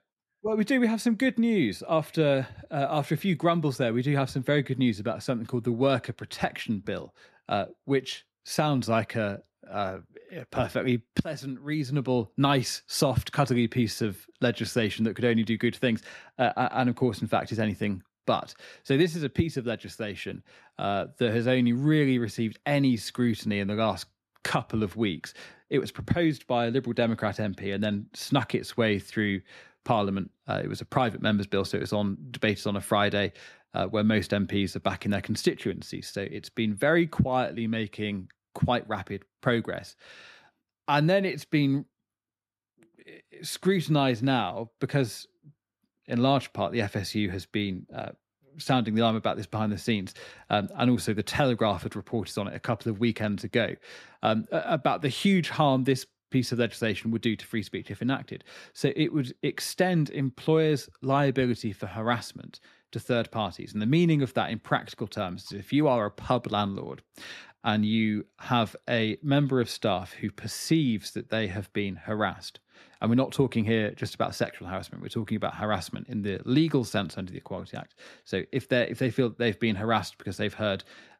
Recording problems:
none

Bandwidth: 13.5 kHz